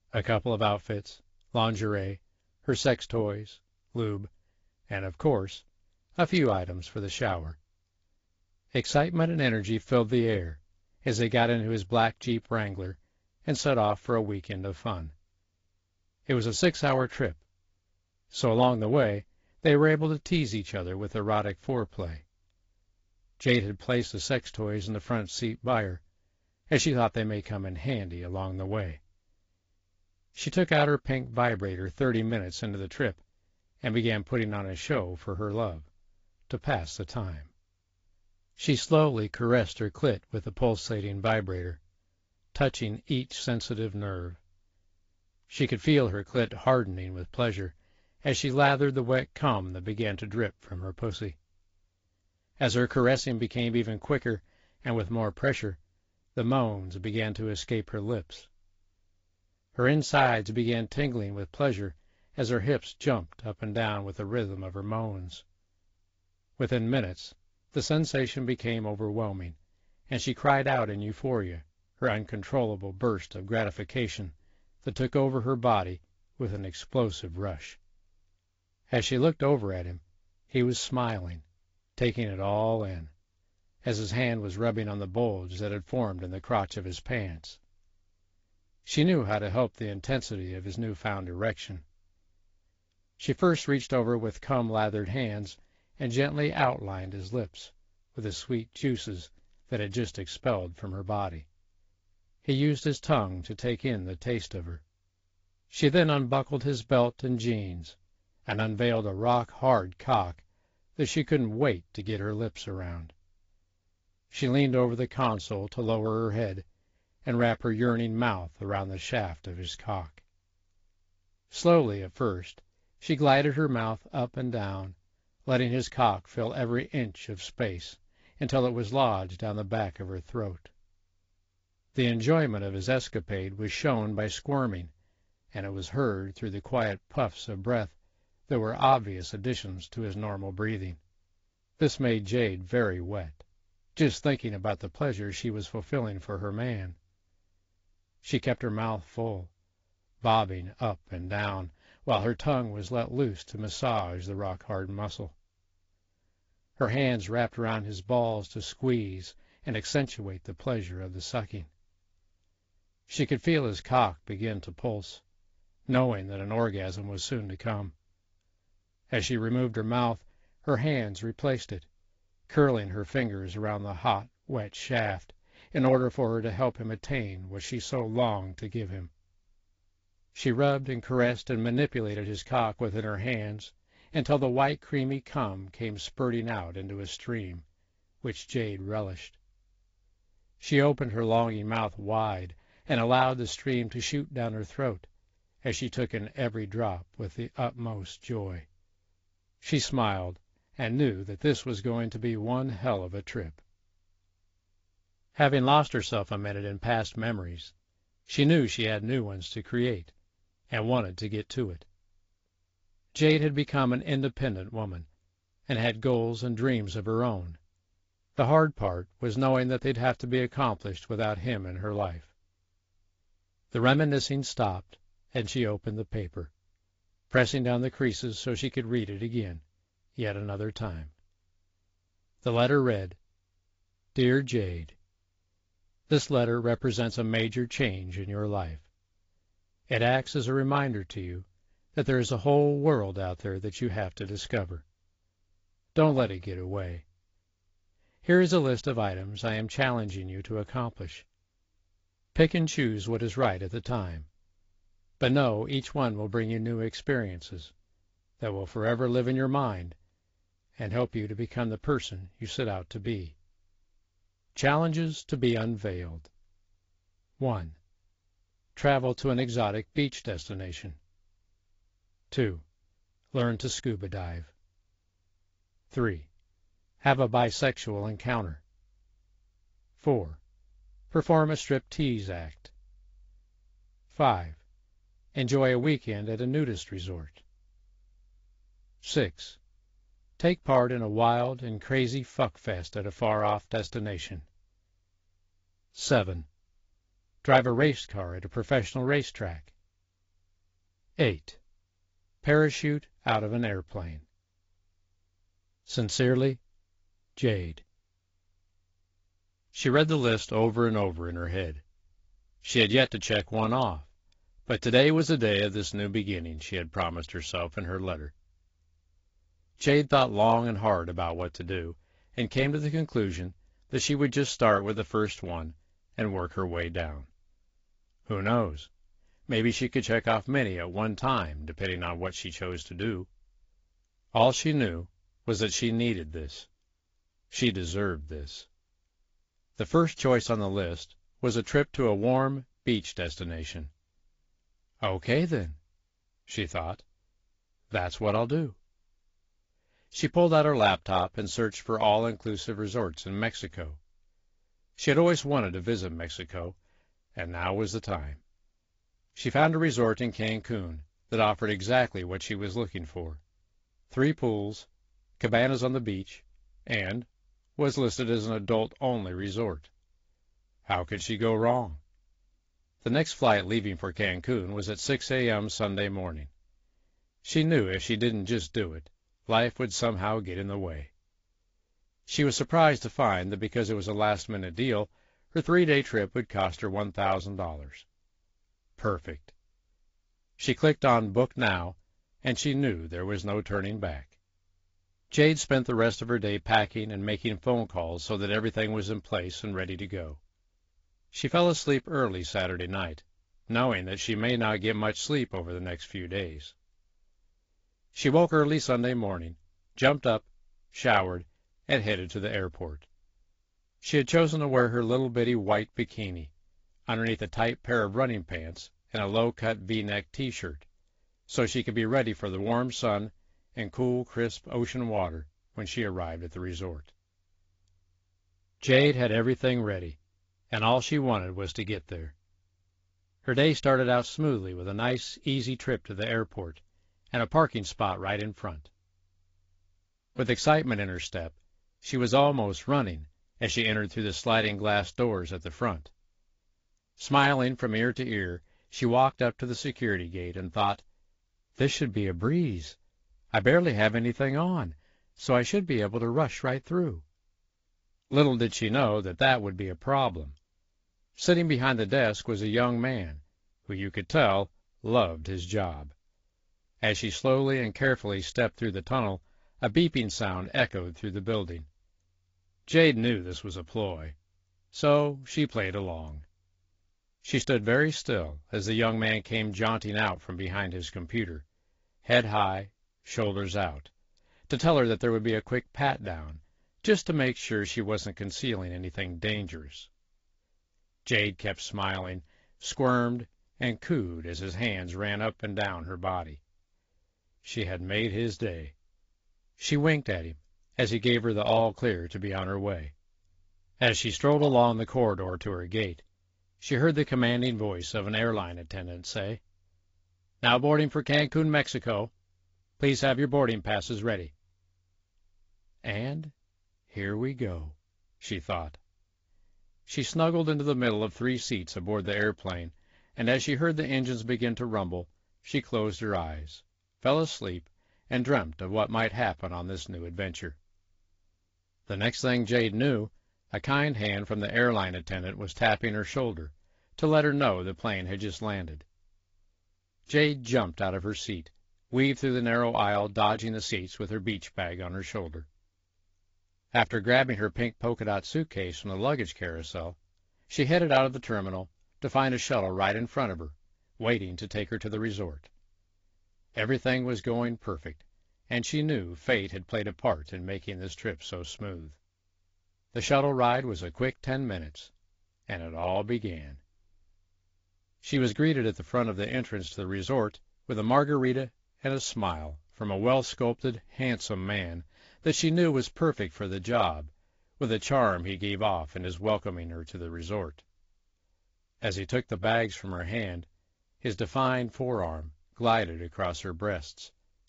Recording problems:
garbled, watery; slightly; nothing above 7.5 kHz

